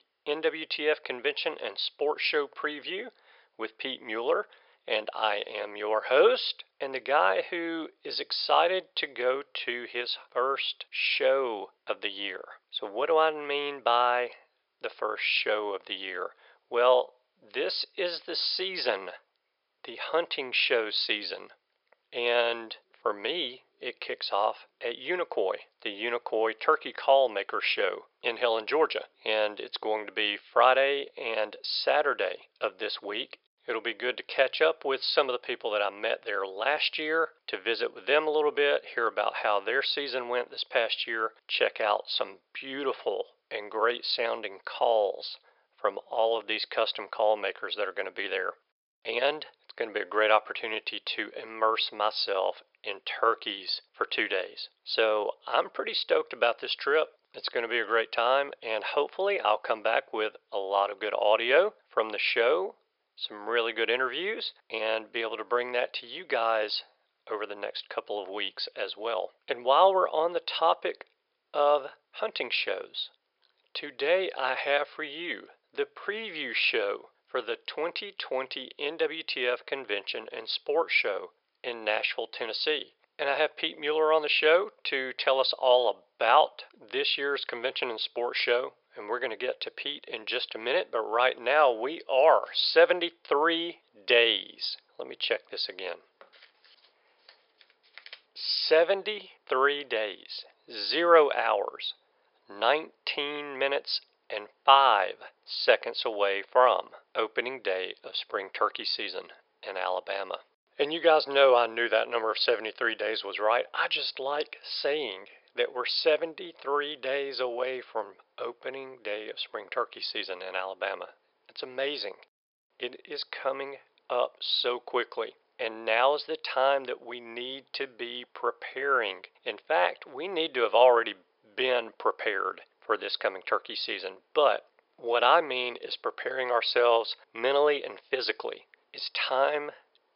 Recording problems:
thin; very; fading below 500 Hz
high frequencies cut off; noticeable; nothing above 5.5 kHz

